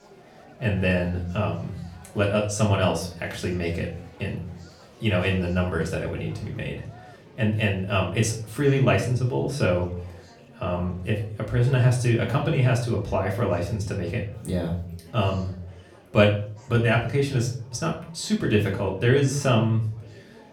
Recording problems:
off-mic speech; far
room echo; slight; dies away in 0.4 s
murmuring crowd; faint; throughout; 25 dB below the speech

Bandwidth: 18 kHz